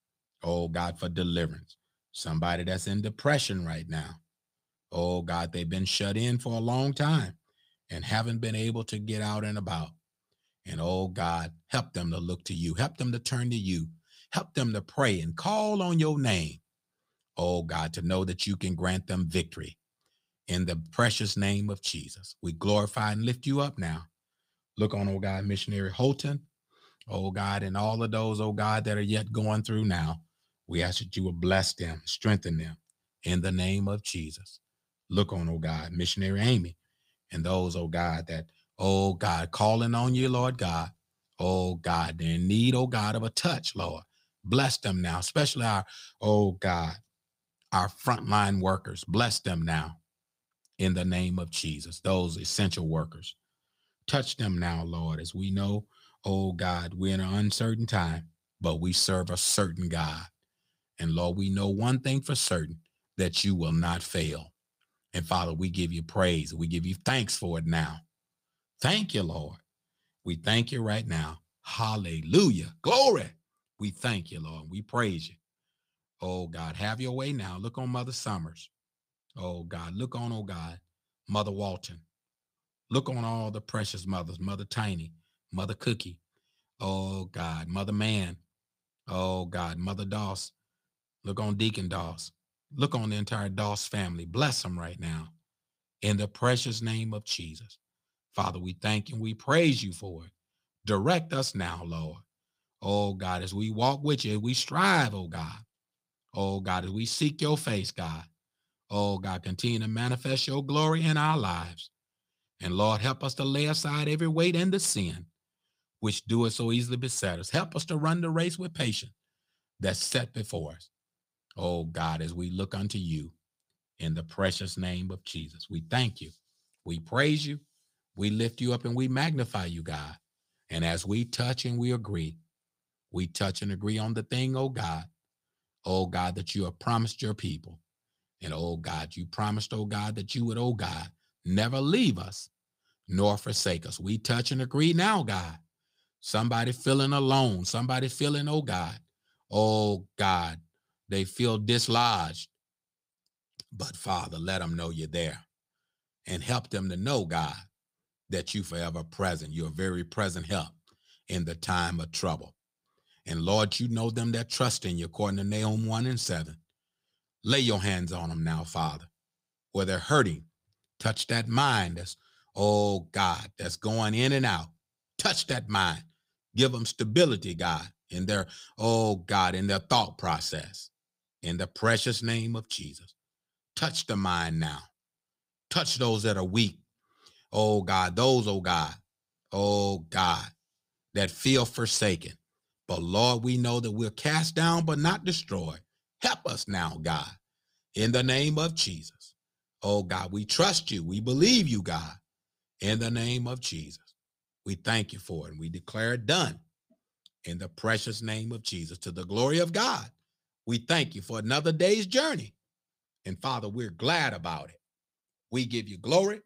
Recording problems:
none

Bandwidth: 15.5 kHz